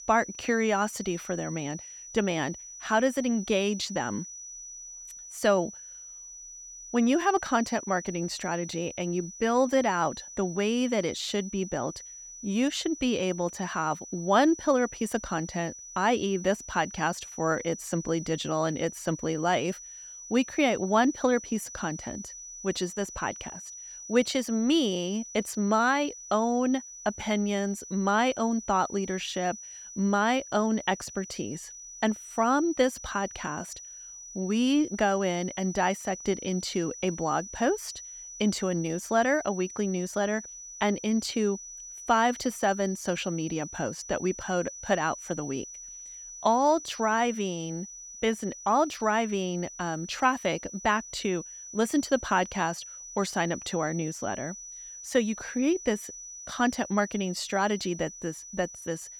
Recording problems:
high-pitched whine; noticeable; throughout; 6 kHz, 10 dB below the speech

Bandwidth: 18 kHz